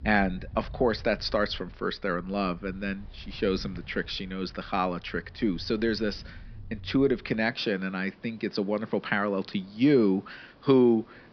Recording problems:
high frequencies cut off; noticeable; nothing above 5.5 kHz
rain or running water; noticeable; throughout; 20 dB below the speech

